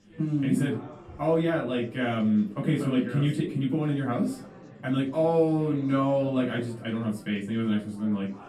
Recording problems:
off-mic speech; far
room echo; slight; dies away in 0.3 s
chatter from many people; faint; throughout; 20 dB below the speech

